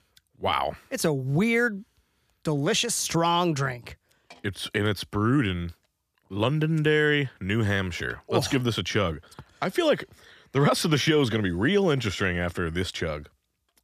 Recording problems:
none

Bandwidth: 14.5 kHz